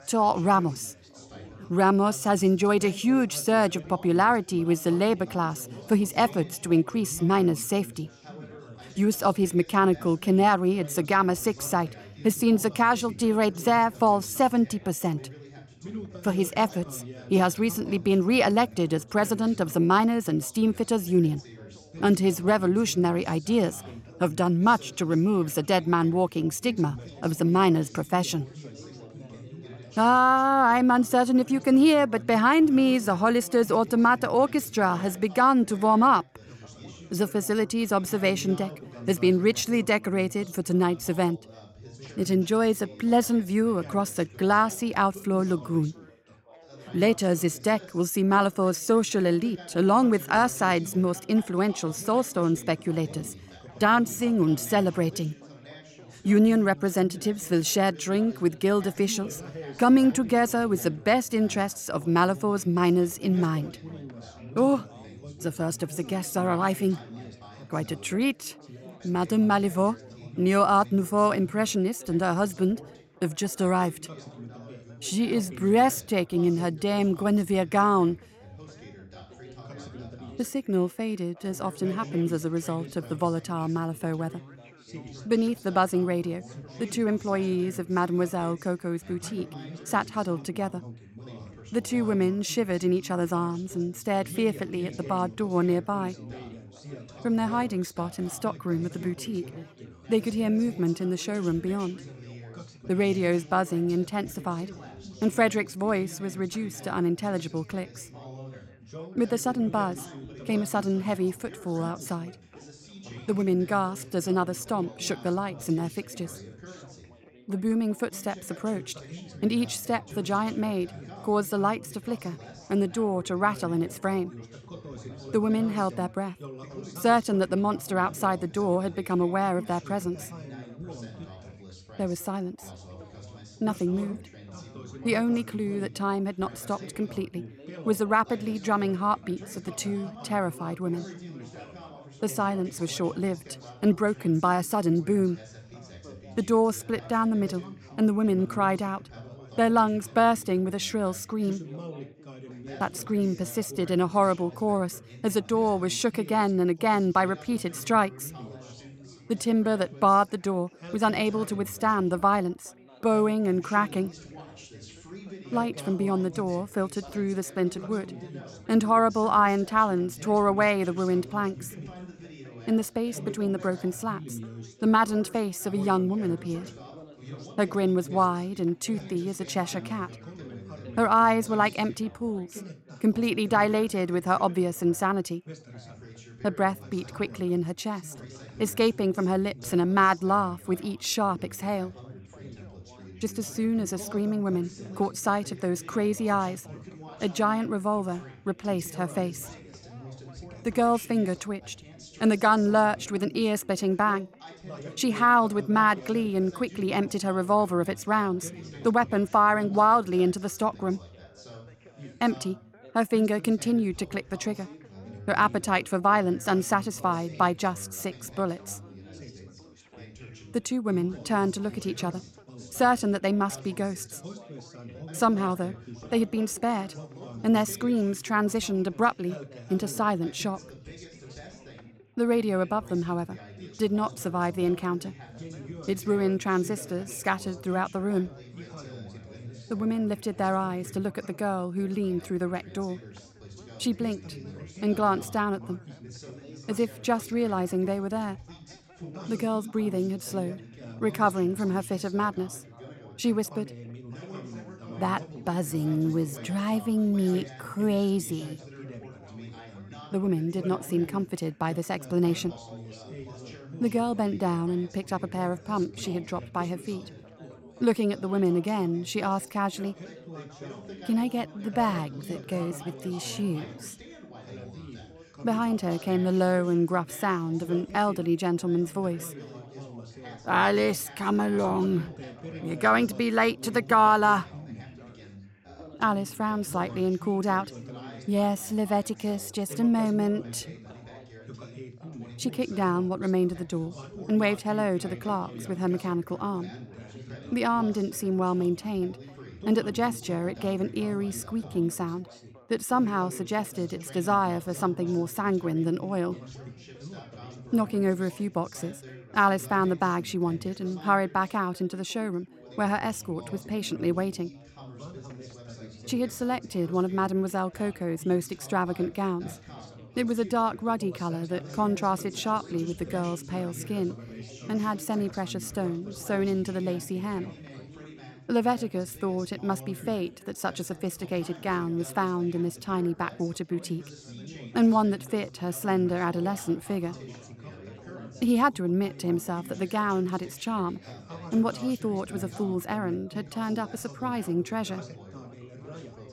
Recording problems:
background chatter; noticeable; throughout; 4 voices, 20 dB below the speech

